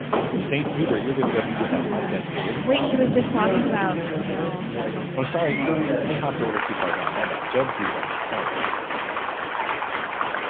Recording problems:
phone-call audio; poor line; nothing above 3.5 kHz
crowd noise; very loud; throughout; 1 dB above the speech

